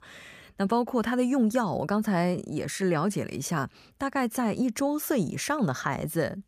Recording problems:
none

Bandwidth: 15 kHz